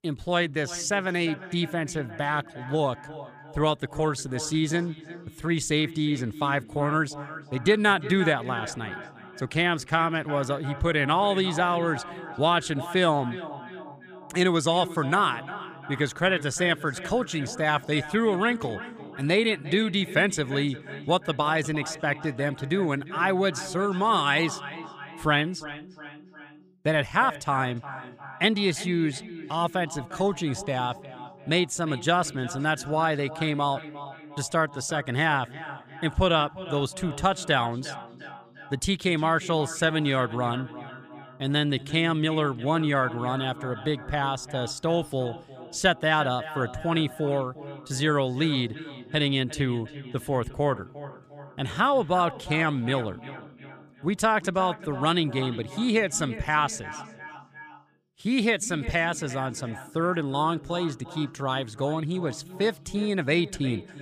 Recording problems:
echo of what is said; noticeable; throughout; 350 ms later, 15 dB below the speech

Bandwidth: 15 kHz